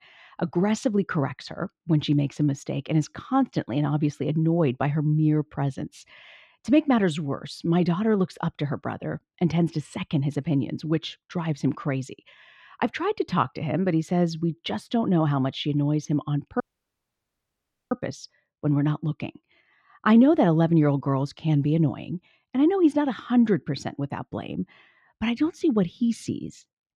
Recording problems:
muffled; slightly; fading above 3 kHz
audio cutting out; at 17 s for 1.5 s

